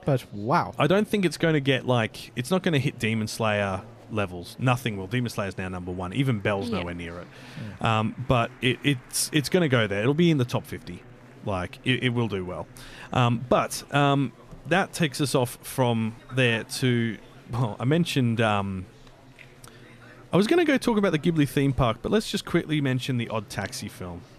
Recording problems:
murmuring crowd; faint; throughout; 25 dB below the speech

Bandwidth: 14.5 kHz